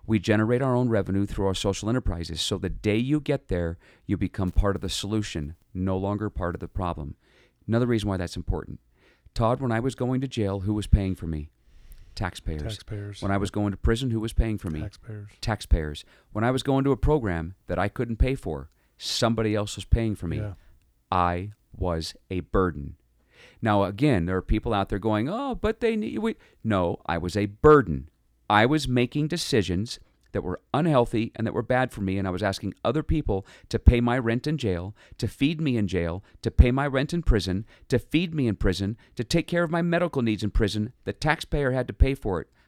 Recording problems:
none

